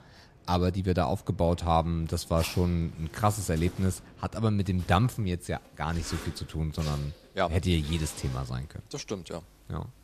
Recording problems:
household noises; noticeable; throughout; 15 dB below the speech

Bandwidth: 14 kHz